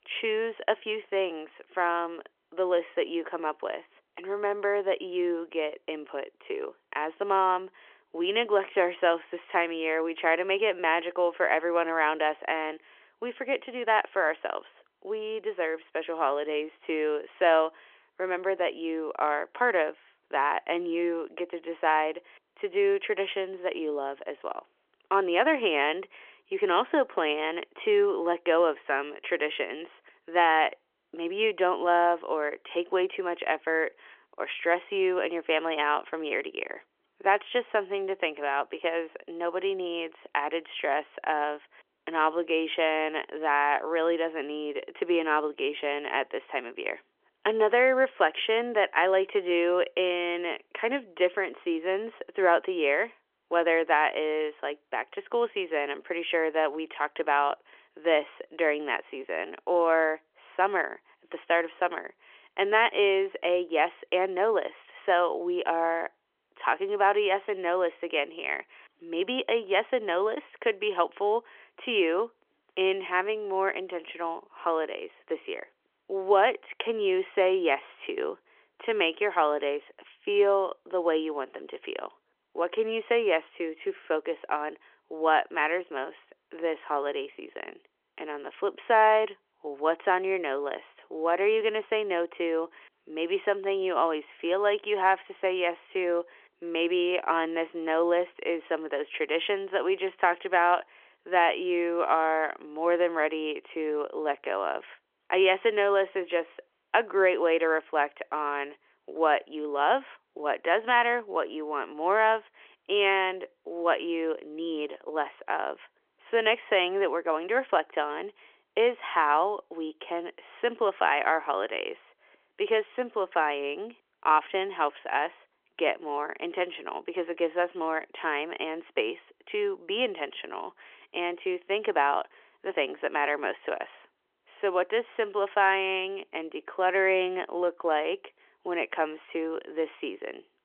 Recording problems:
phone-call audio; nothing above 3.5 kHz

